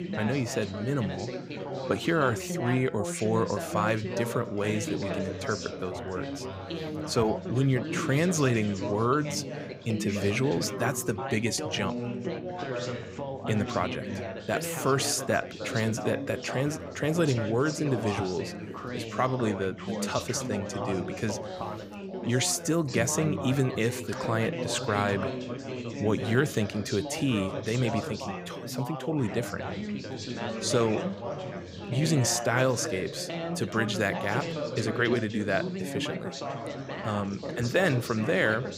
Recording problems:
background chatter; loud; throughout; 4 voices, 6 dB below the speech

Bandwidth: 15.5 kHz